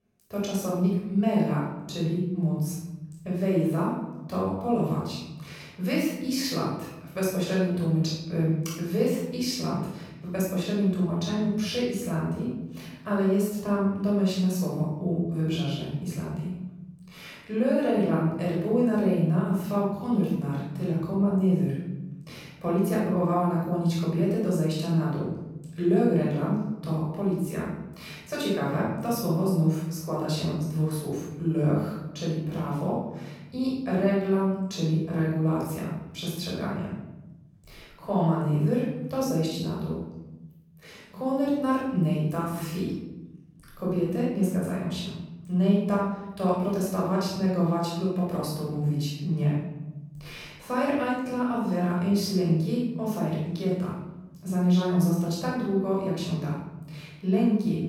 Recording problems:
room echo; strong; dies away in 1.3 s
off-mic speech; far

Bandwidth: 18.5 kHz